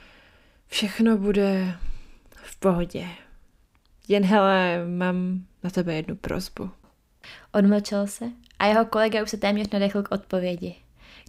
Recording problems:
none

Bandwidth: 15.5 kHz